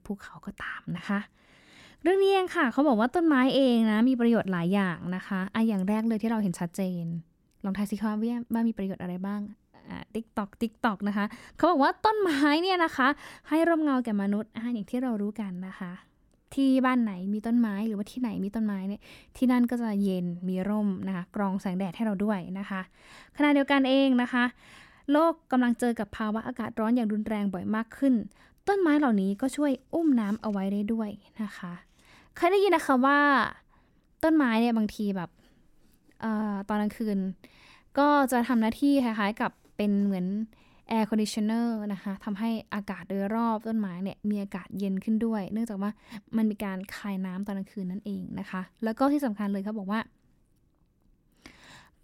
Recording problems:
none

